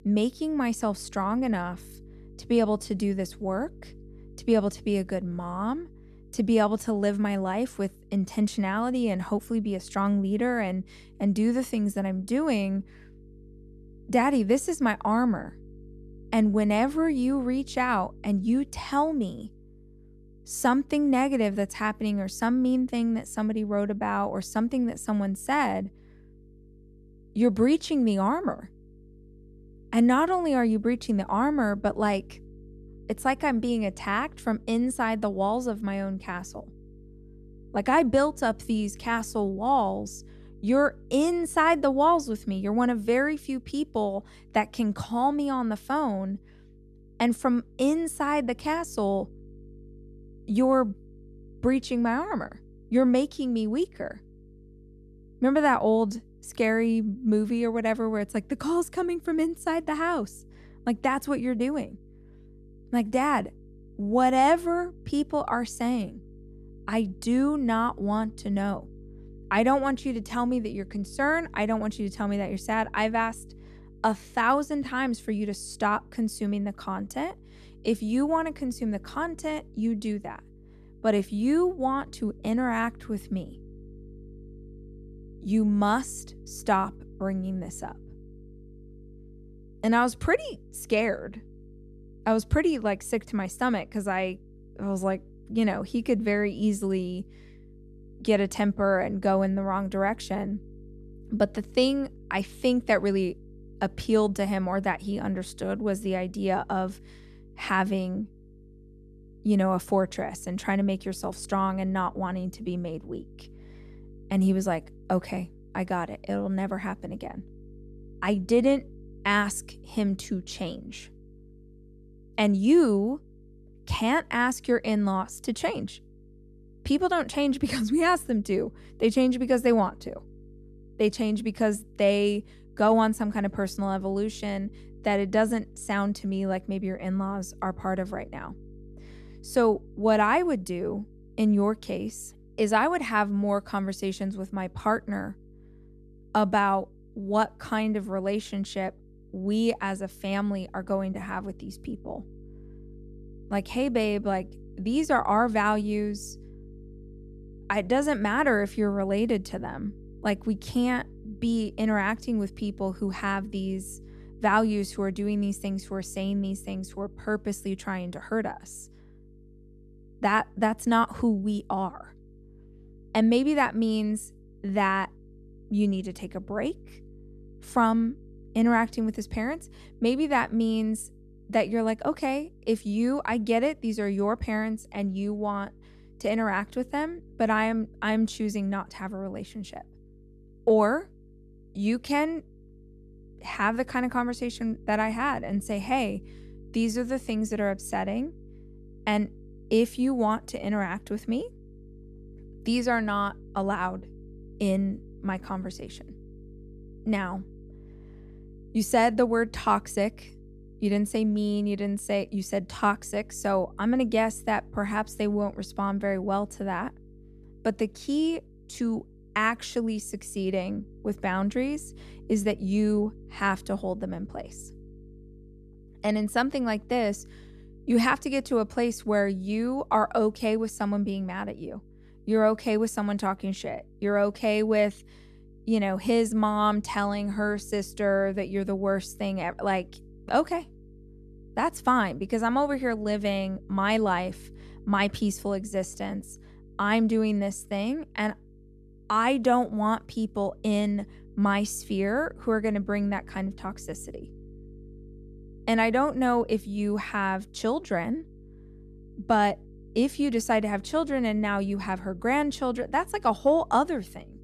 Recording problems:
electrical hum; faint; throughout; 50 Hz, 30 dB below the speech

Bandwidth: 13.5 kHz